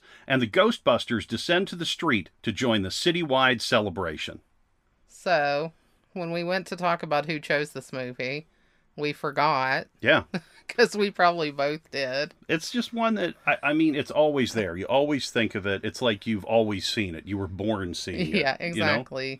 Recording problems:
none

